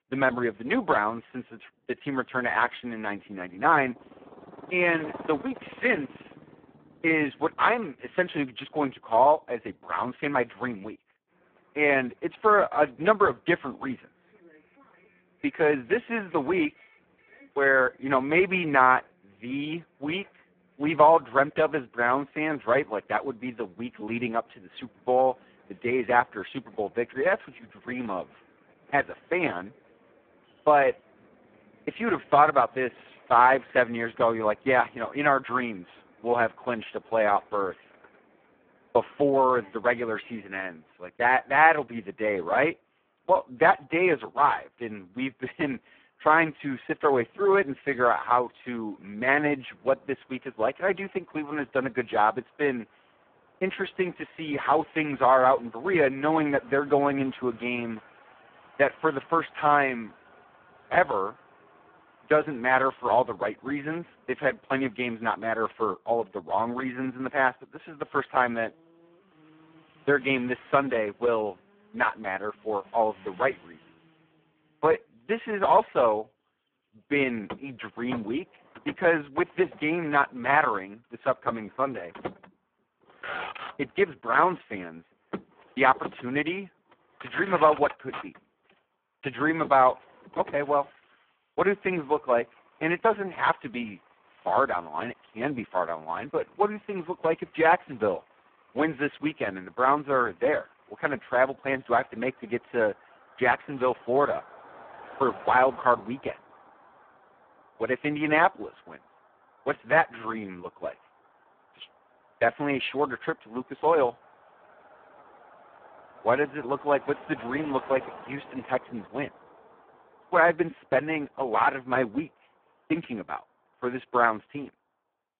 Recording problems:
phone-call audio; poor line
traffic noise; faint; throughout; 20 dB below the speech

